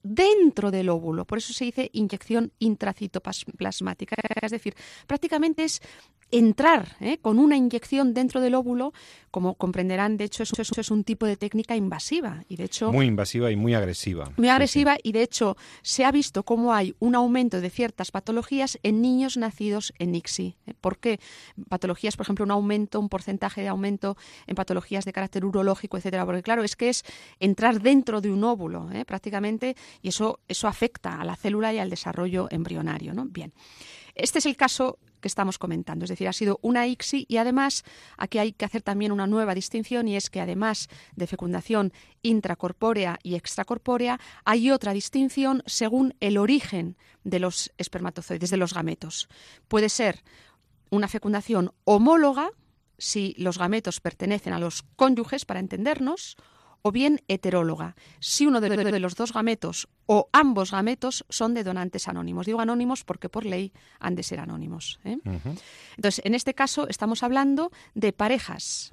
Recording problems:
audio stuttering; at 4 s, at 10 s and at 59 s

